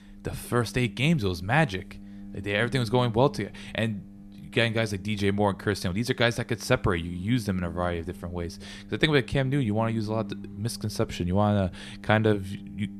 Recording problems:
low rumble; faint; throughout; 20 dB below the speech

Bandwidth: 13.5 kHz